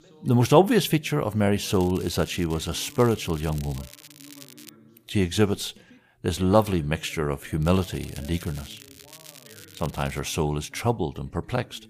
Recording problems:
background chatter; faint; throughout; 2 voices, 25 dB below the speech
crackling; faint; from 1.5 to 4.5 s and from 7.5 to 10 s; 20 dB below the speech

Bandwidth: 15 kHz